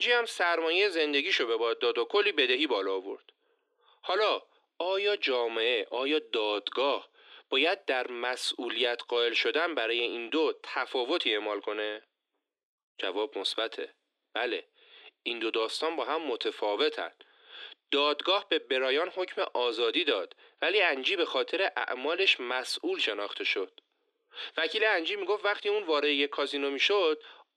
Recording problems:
thin; somewhat; fading below 300 Hz
abrupt cut into speech; at the start

